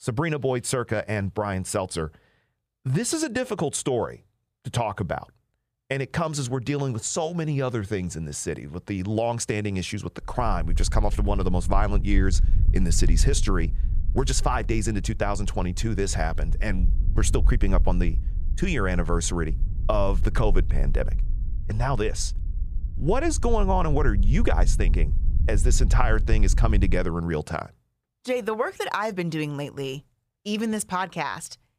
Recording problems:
wind noise on the microphone; occasional gusts; from 10 to 27 s; 20 dB below the speech

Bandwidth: 15 kHz